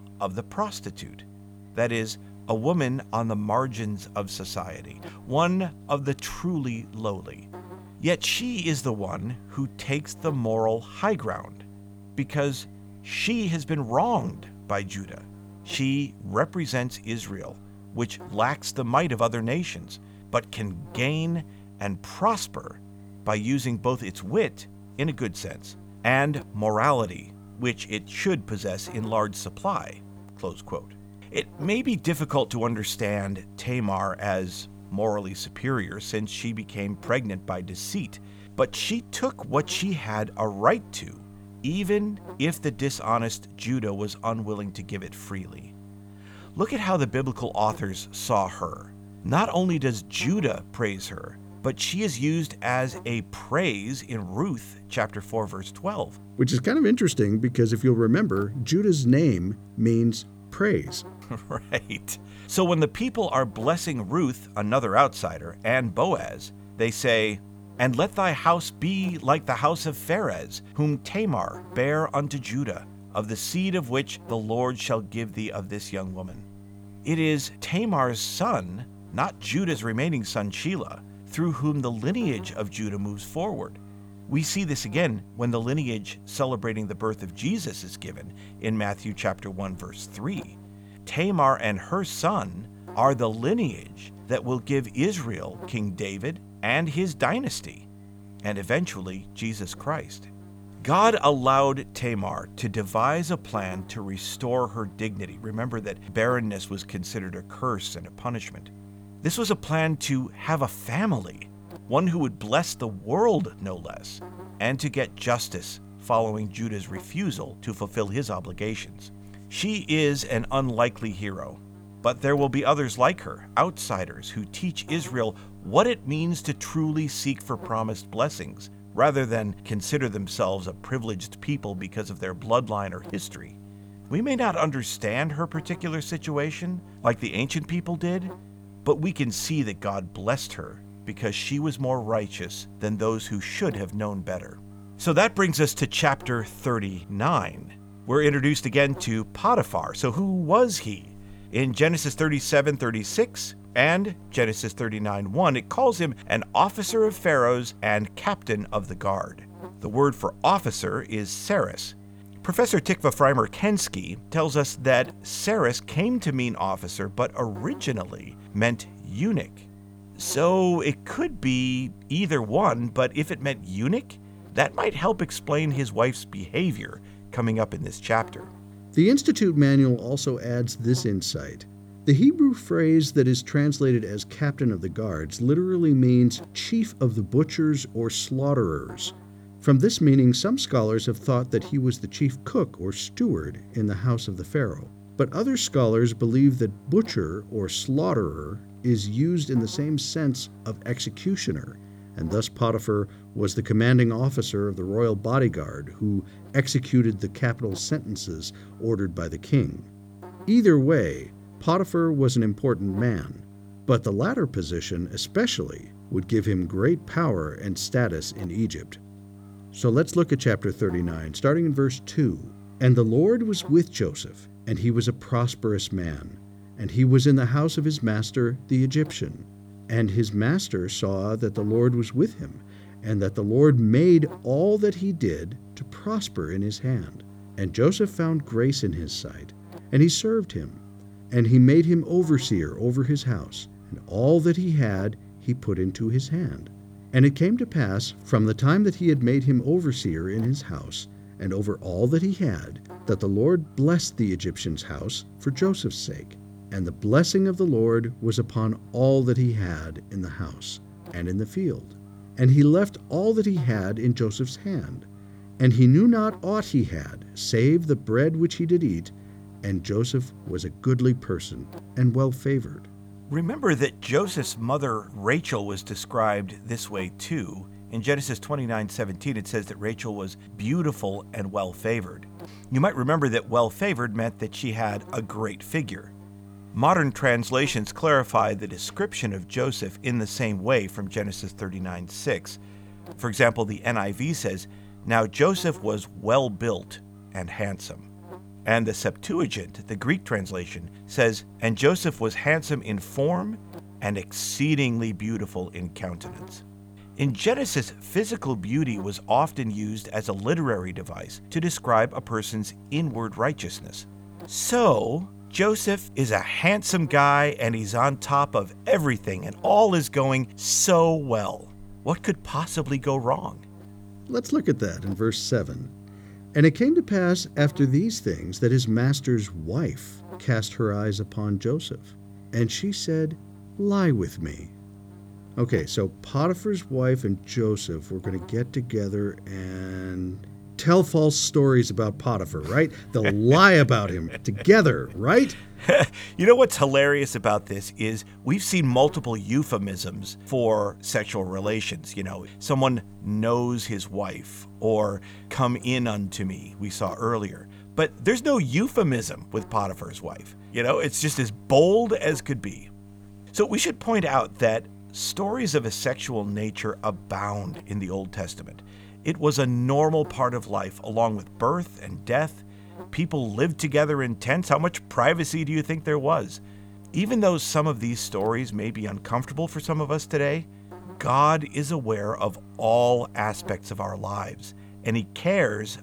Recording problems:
electrical hum; faint; throughout; 50 Hz, 25 dB below the speech

